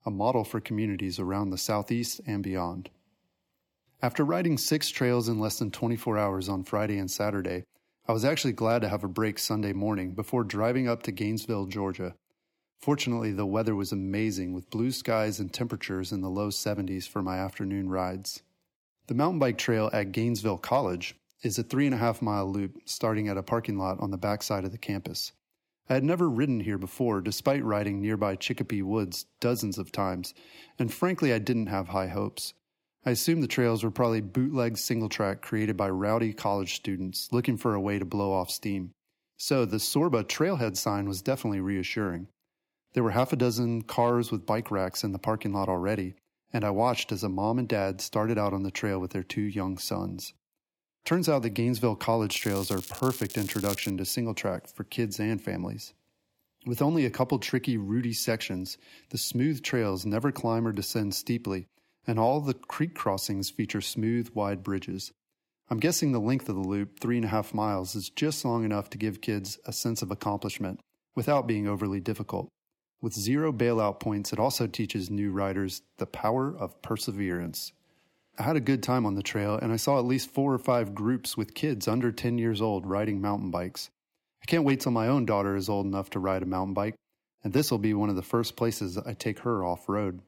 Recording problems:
crackling; loud; from 52 to 54 s; 9 dB below the speech

